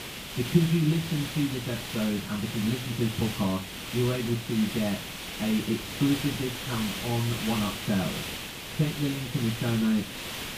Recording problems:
off-mic speech; far
muffled; very; fading above 1.5 kHz
room echo; very slight; dies away in 0.2 s
hiss; loud; throughout; 6 dB below the speech
high-pitched whine; very faint; throughout; 9.5 kHz, 30 dB below the speech

